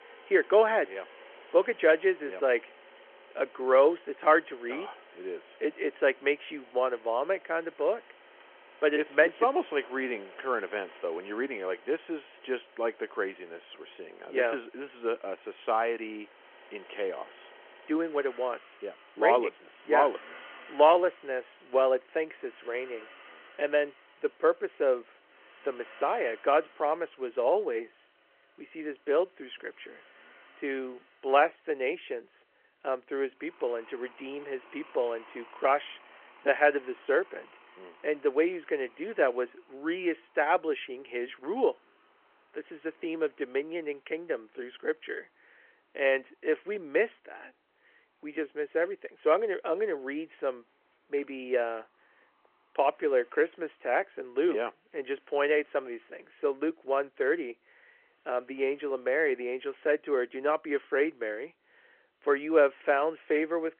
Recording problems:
phone-call audio
traffic noise; faint; throughout; 25 dB below the speech

